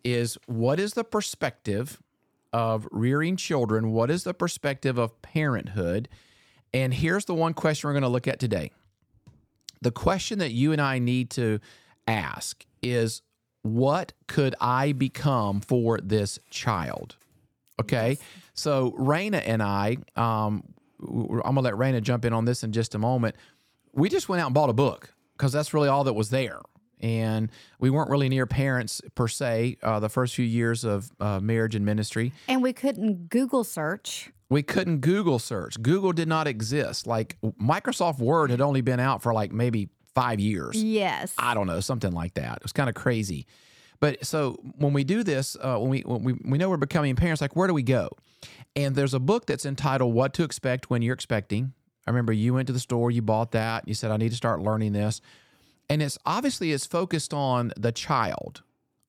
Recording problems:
none

